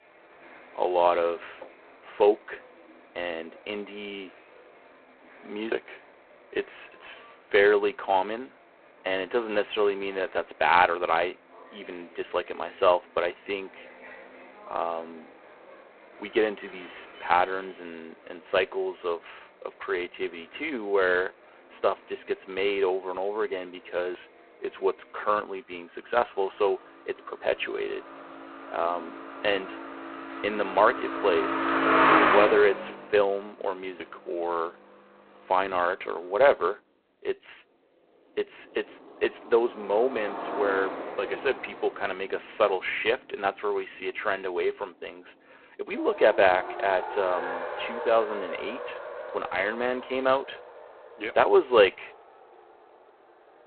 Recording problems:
phone-call audio; poor line; nothing above 4 kHz
traffic noise; loud; throughout; 4 dB below the speech

